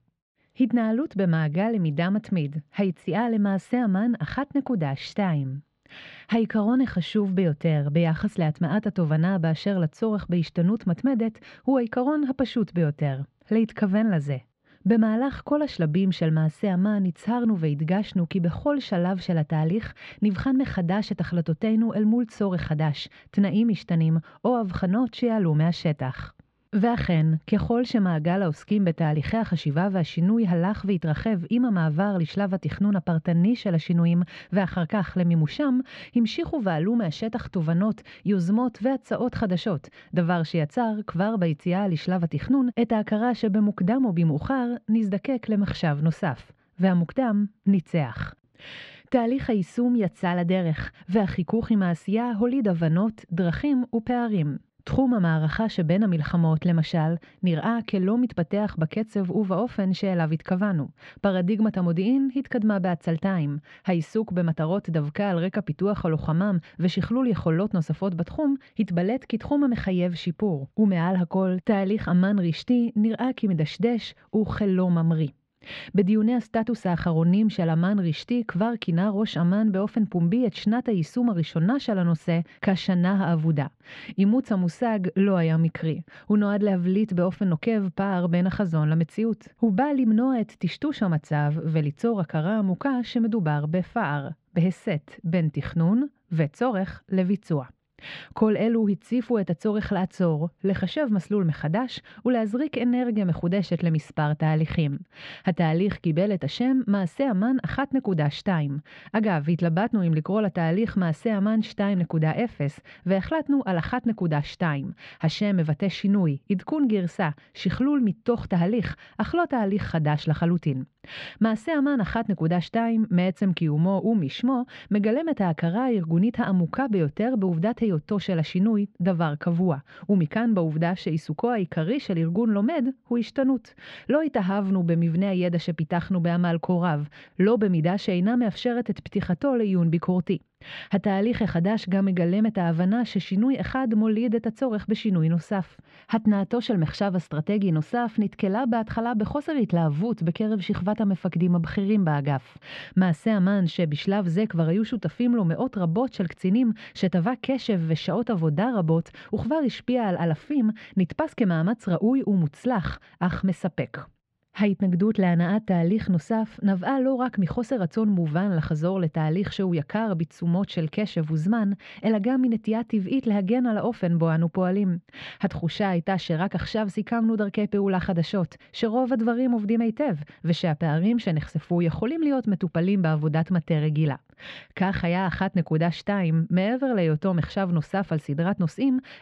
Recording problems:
muffled; slightly; fading above 3.5 kHz

